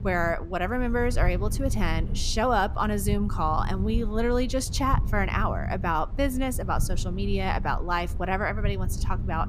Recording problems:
low rumble; noticeable; throughout; 20 dB below the speech

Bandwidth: 15 kHz